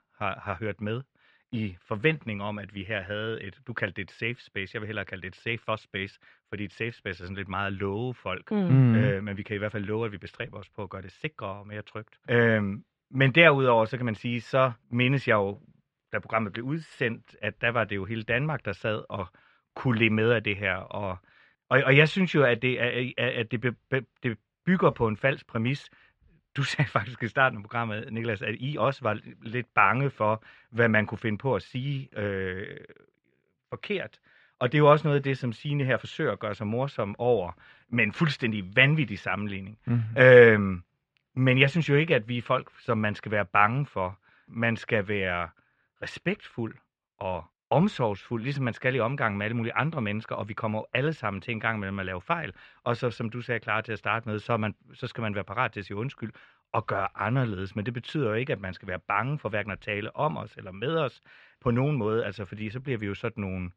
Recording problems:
muffled; slightly; fading above 3 kHz

